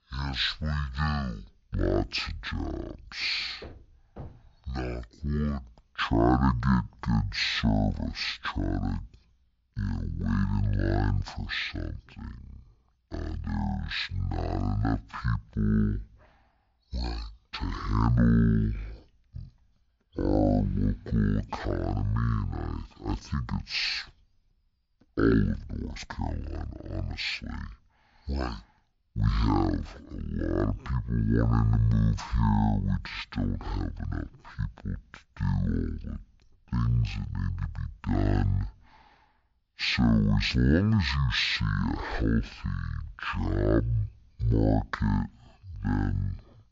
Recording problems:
wrong speed and pitch; too slow and too low; 0.5 times normal speed

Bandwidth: 7.5 kHz